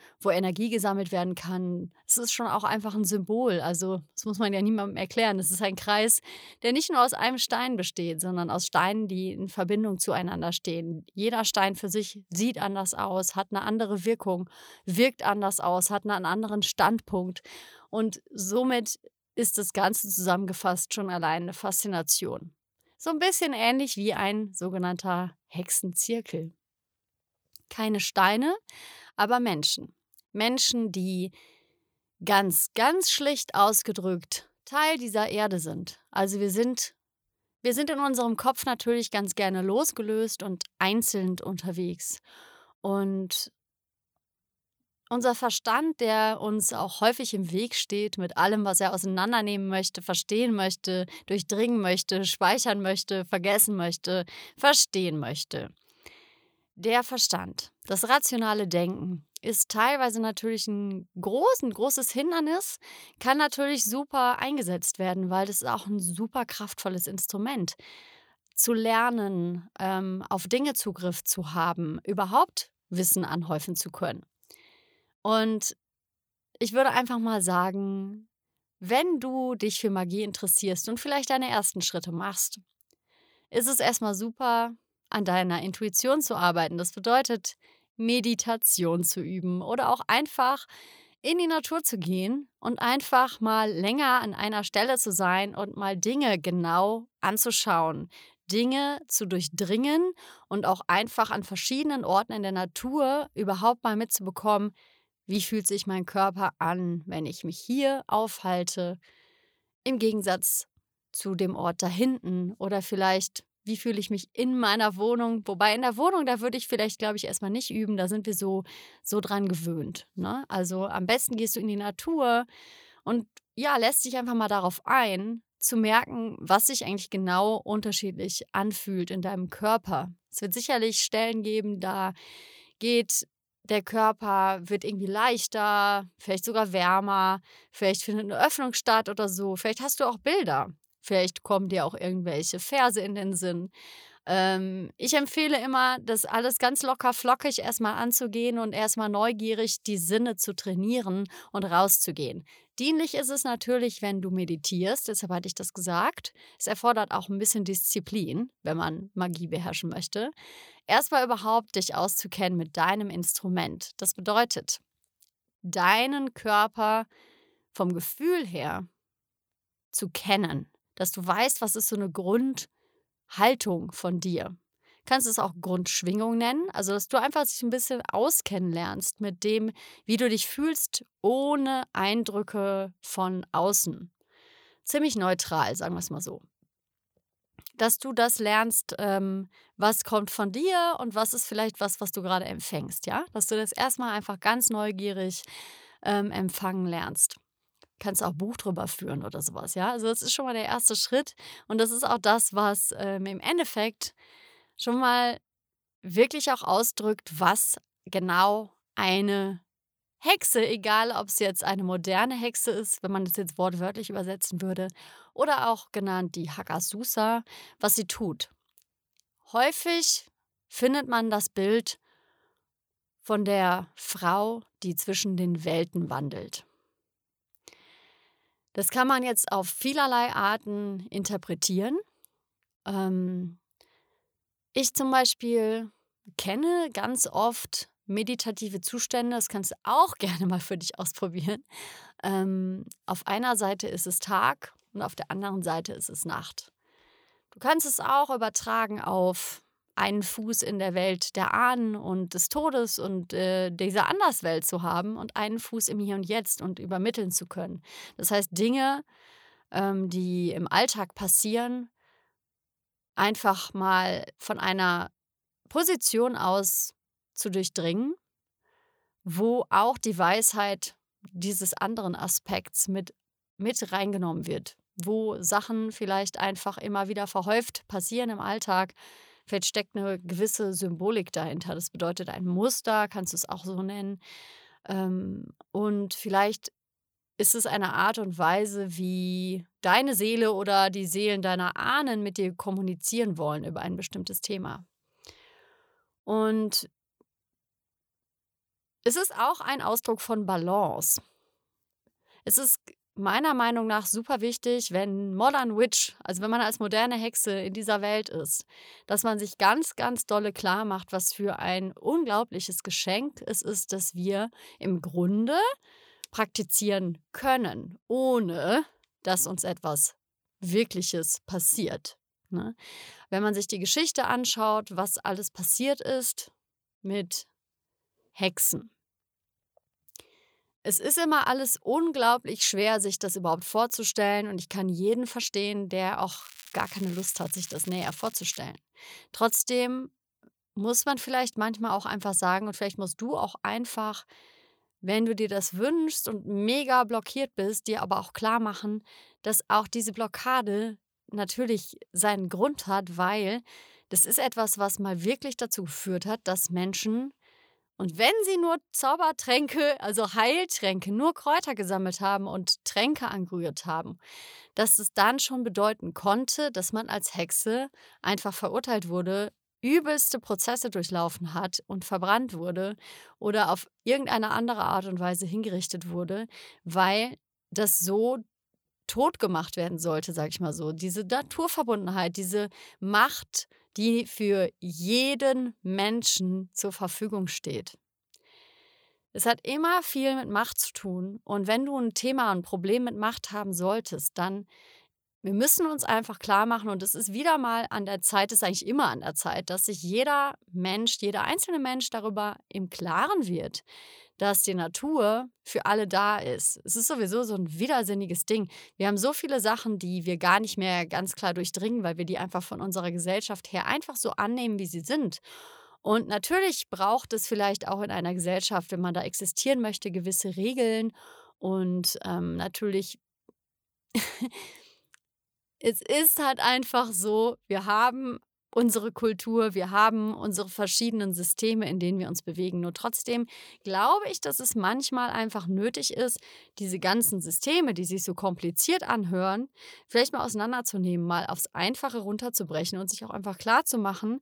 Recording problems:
crackling; noticeable; from 5:36 to 5:39; 20 dB below the speech

